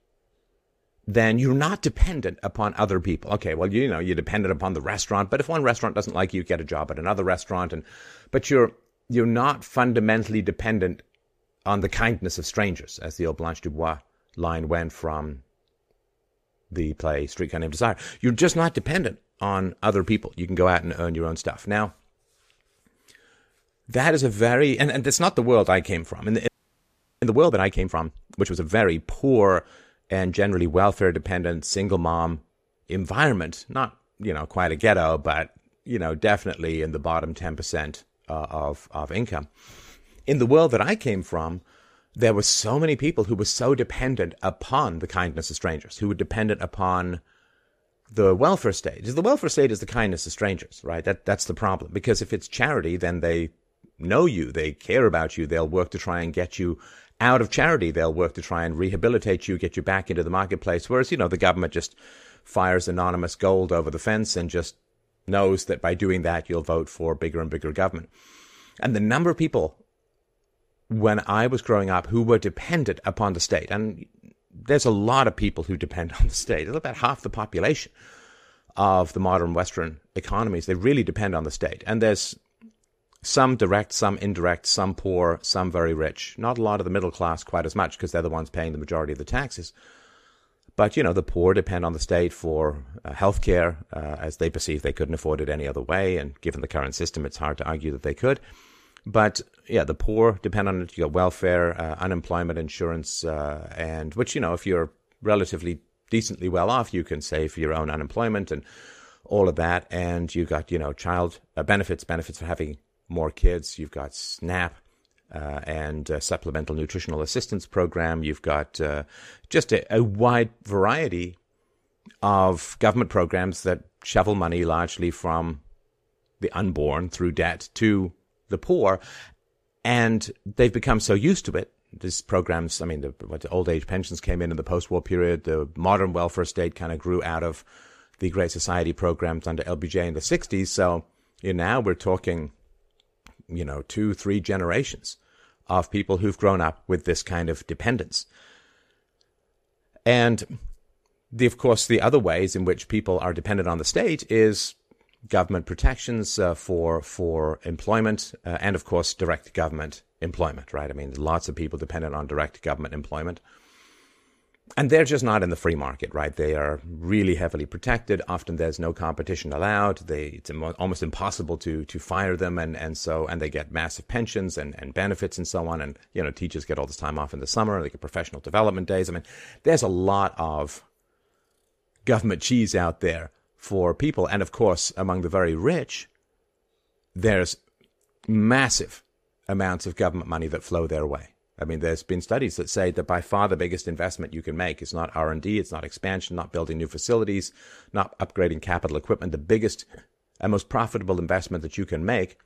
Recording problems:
audio freezing; at 26 s for 0.5 s

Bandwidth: 14.5 kHz